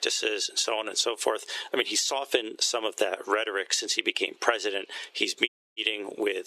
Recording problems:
thin; very; fading below 350 Hz
squashed, flat; somewhat
audio cutting out; at 5.5 s

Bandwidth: 13.5 kHz